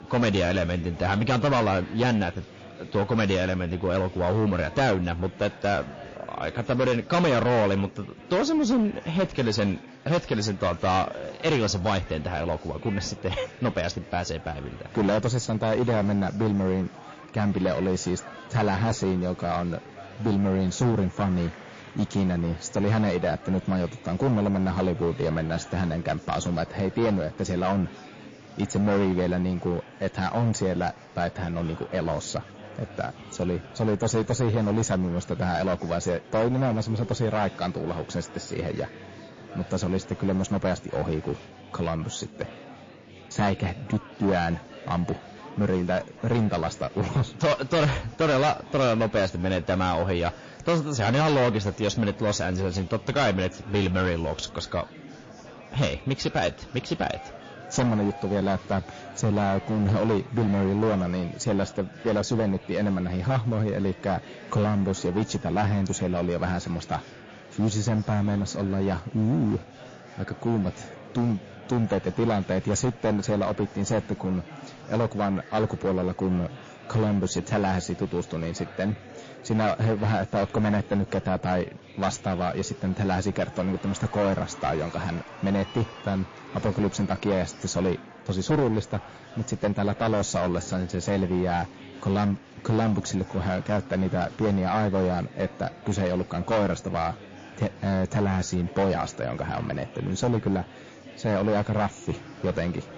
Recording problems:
distortion; heavy; 9% of the sound clipped
garbled, watery; slightly
murmuring crowd; noticeable; throughout; 20 dB below the speech

